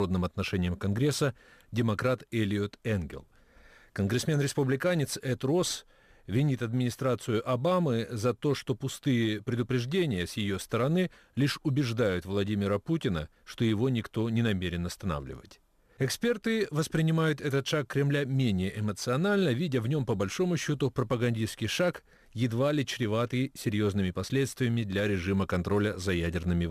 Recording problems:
abrupt cut into speech; at the start and the end

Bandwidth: 15 kHz